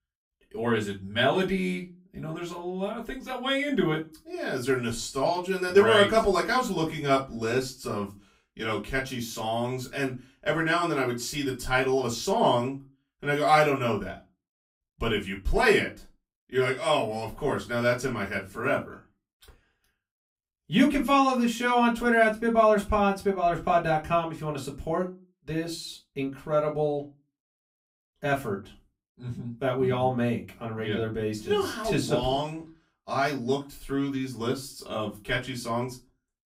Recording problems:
off-mic speech; far
room echo; very slight; dies away in 0.2 s

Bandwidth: 15.5 kHz